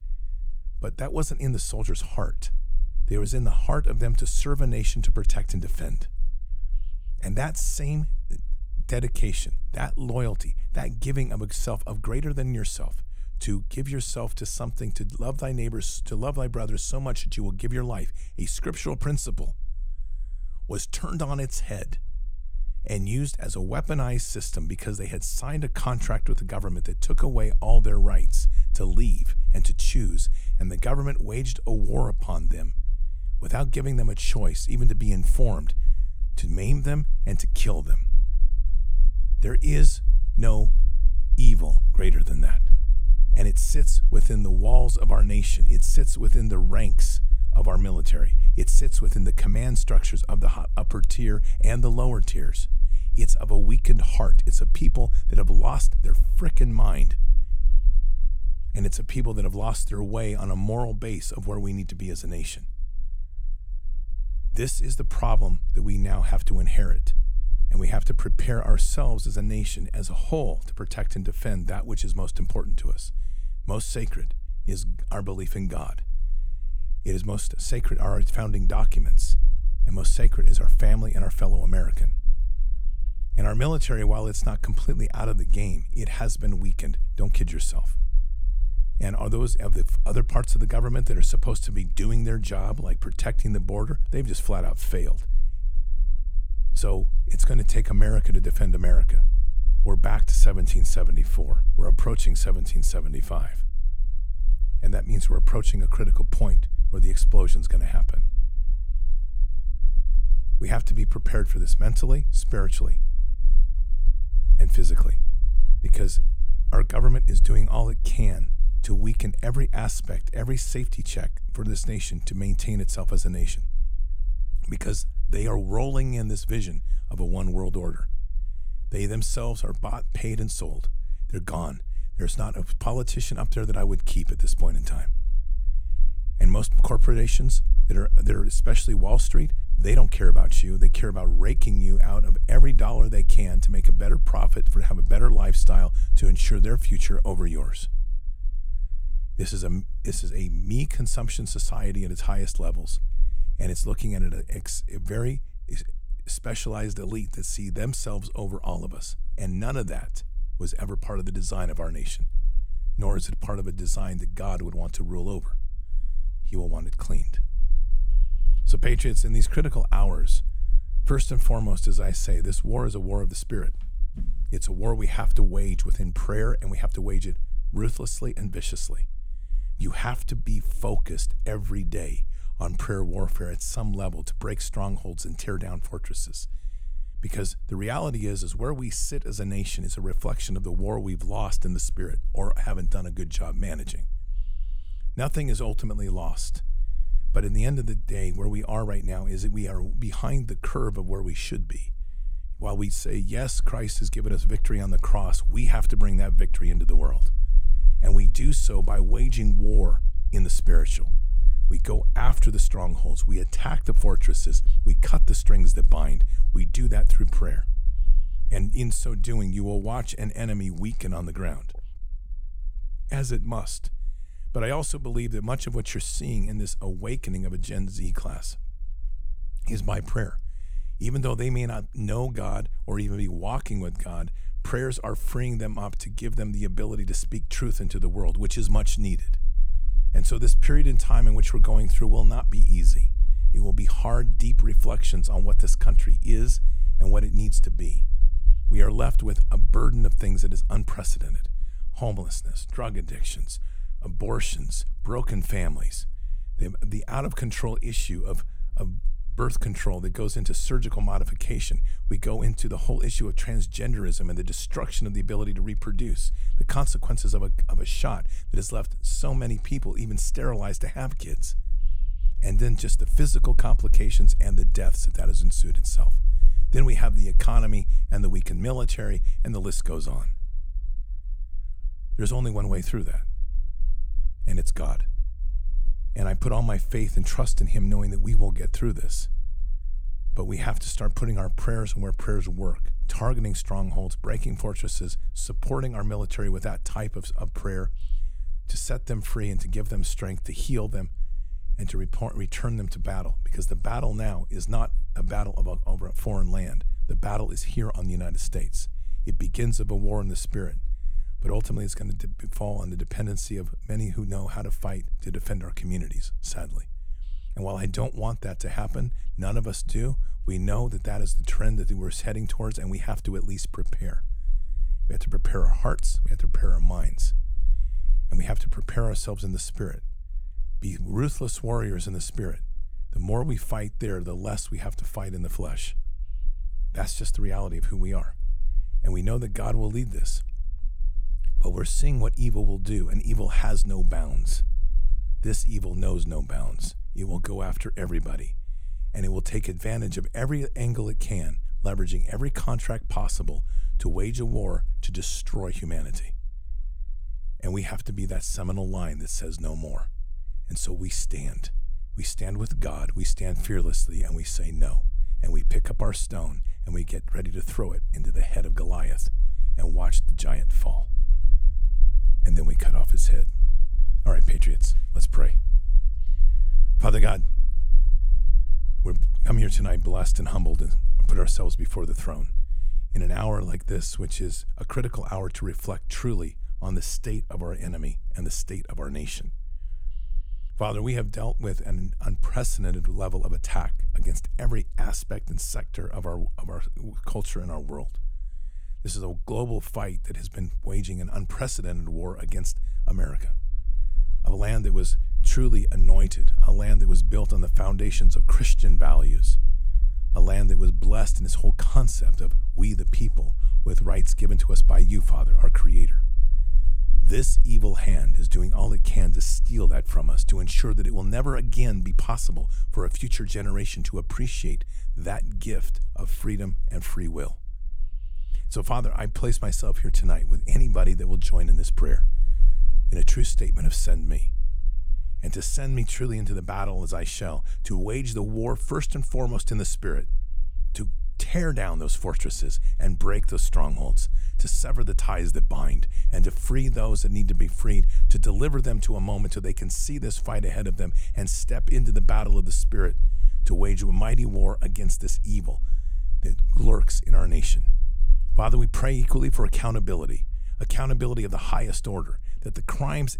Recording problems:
low rumble; faint; throughout; 20 dB below the speech

